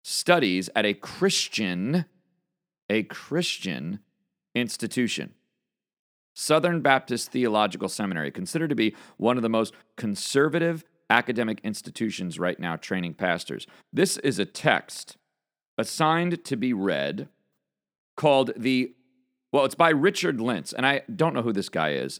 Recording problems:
none

